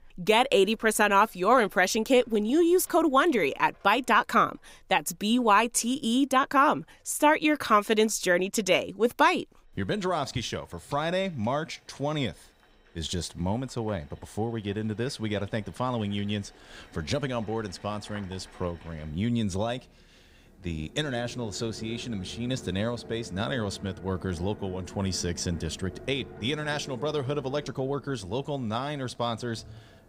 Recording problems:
household noises; faint; throughout; 20 dB below the speech

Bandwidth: 15.5 kHz